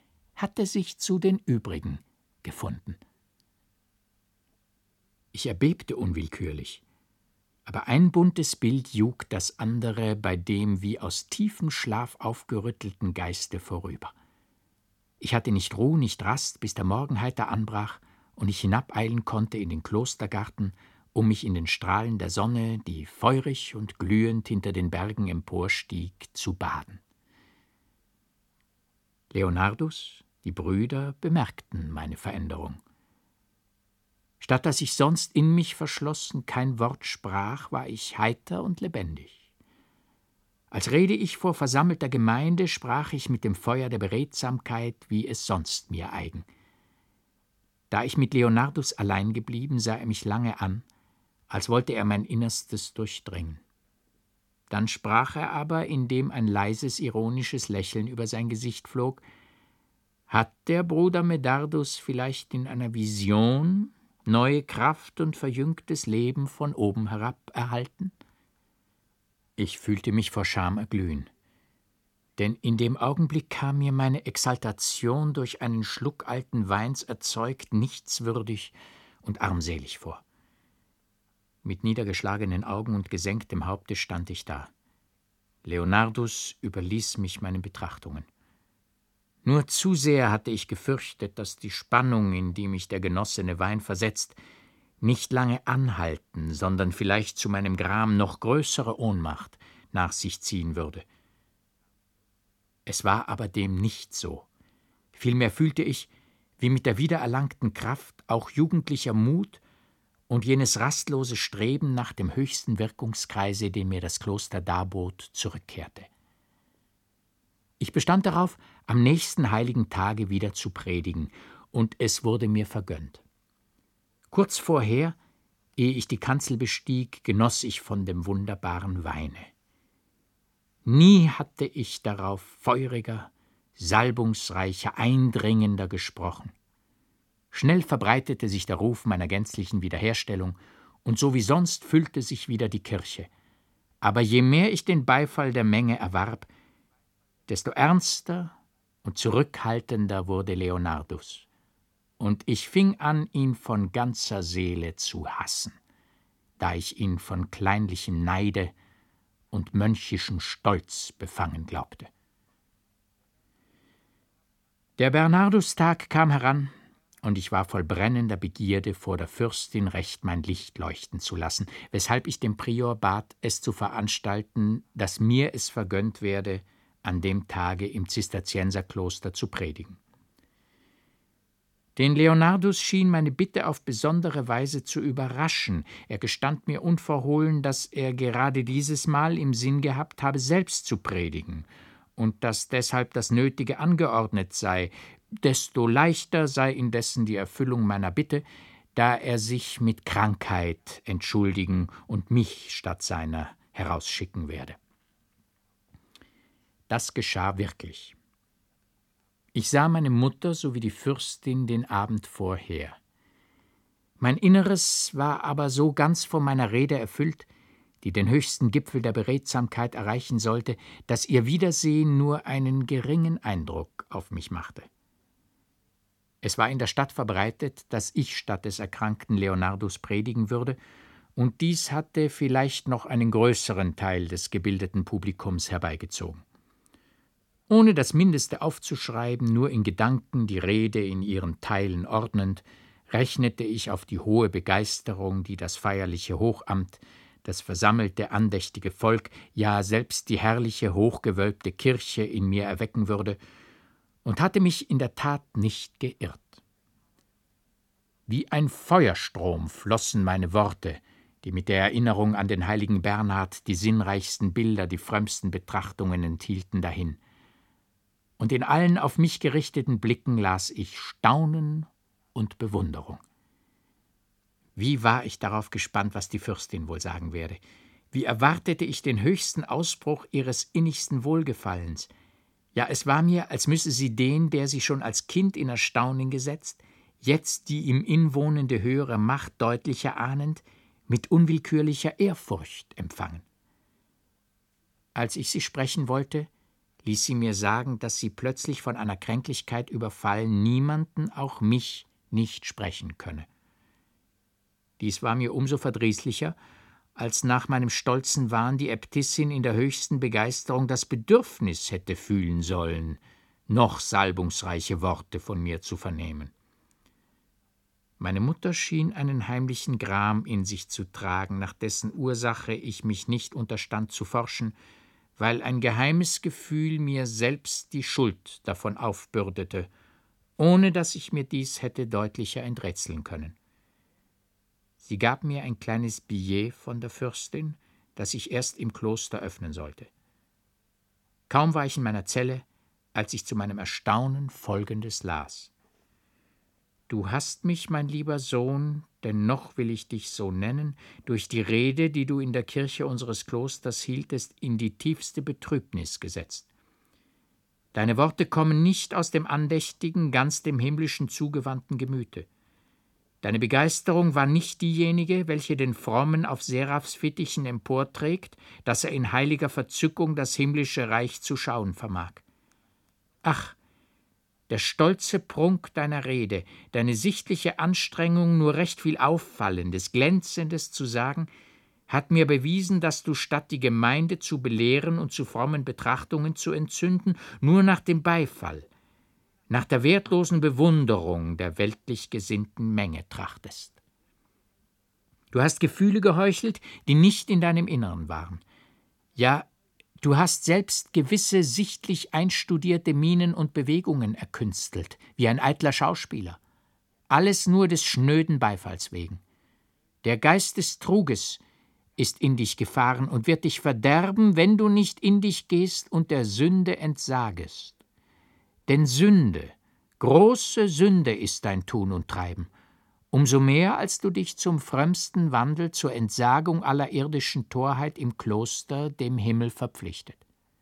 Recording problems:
none

